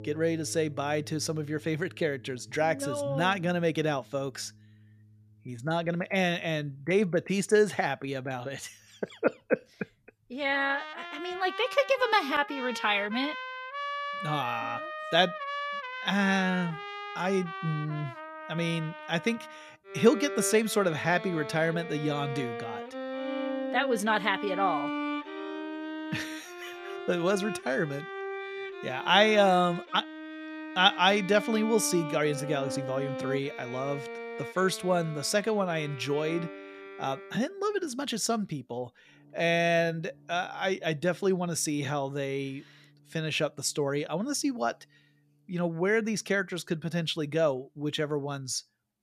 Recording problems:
background music; loud; throughout; 9 dB below the speech

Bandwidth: 14.5 kHz